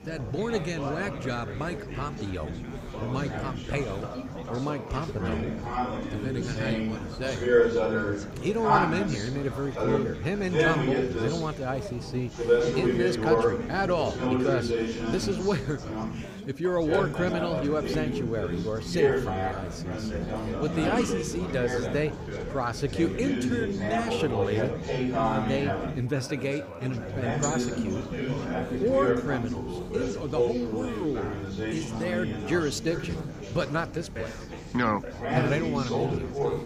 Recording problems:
chatter from many people; very loud; throughout; 1 dB above the speech
hiss; faint; throughout; 25 dB below the speech

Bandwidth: 15.5 kHz